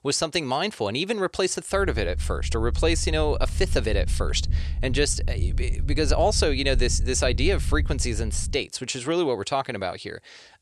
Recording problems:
low rumble; faint; from 2 to 8.5 s; 20 dB below the speech

